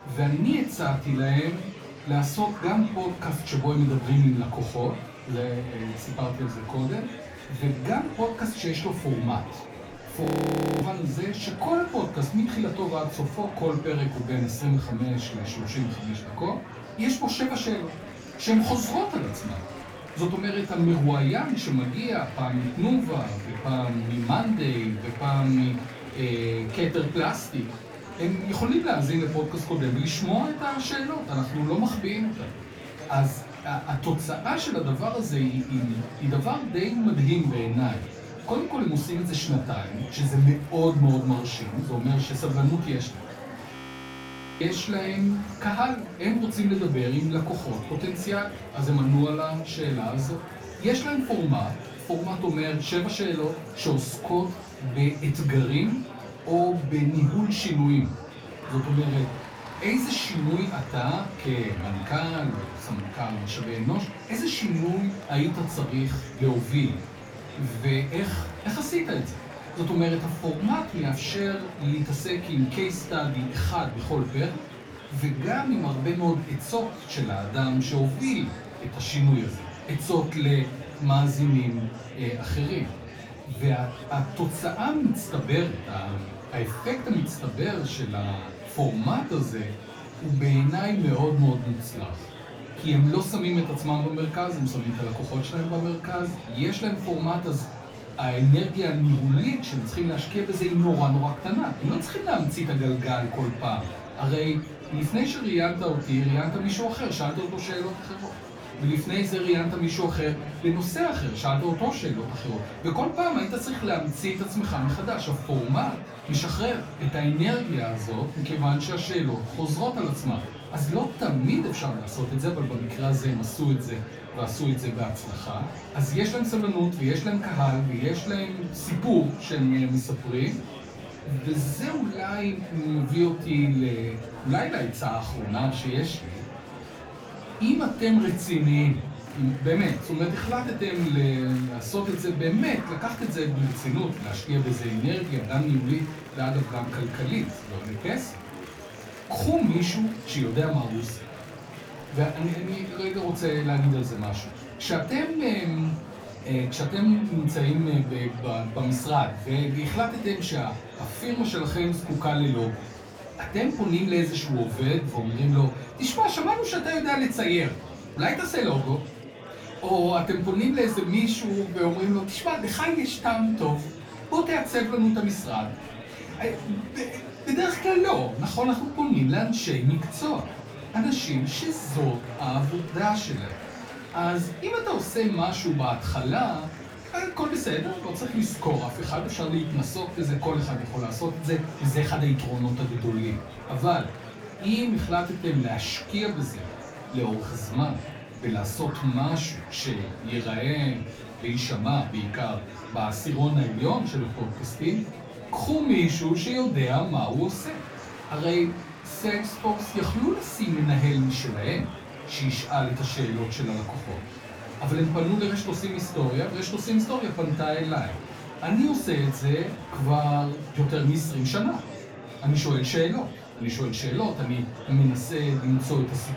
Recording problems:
off-mic speech; far
room echo; slight; dies away in 0.3 s
murmuring crowd; noticeable; throughout; 15 dB below the speech
audio freezing; at 10 s for 0.5 s and at 44 s for 1 s

